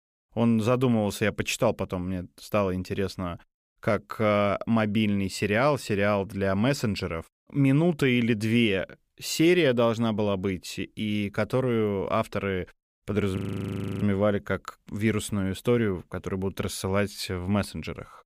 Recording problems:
audio freezing; at 13 s for 0.5 s

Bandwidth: 15 kHz